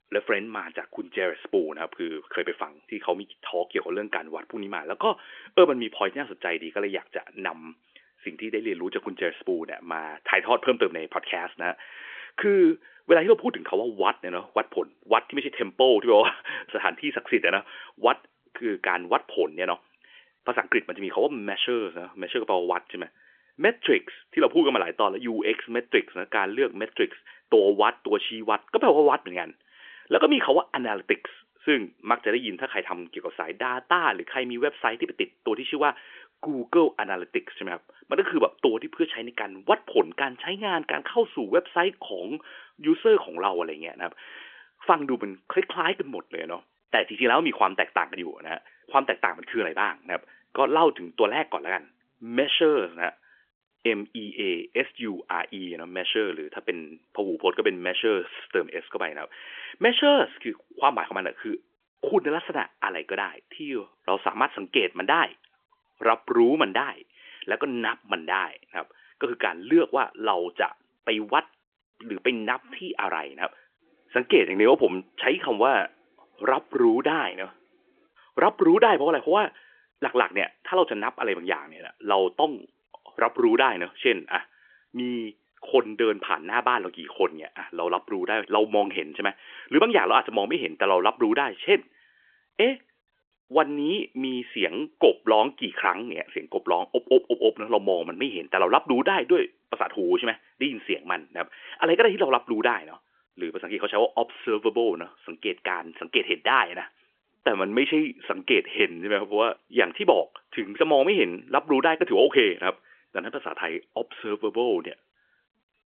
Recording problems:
phone-call audio; nothing above 3.5 kHz

